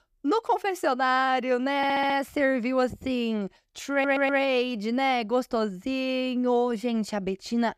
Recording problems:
audio stuttering; at 2 s and at 4 s

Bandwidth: 14.5 kHz